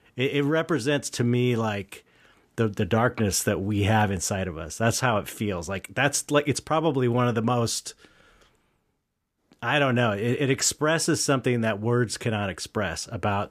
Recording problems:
none

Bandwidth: 14.5 kHz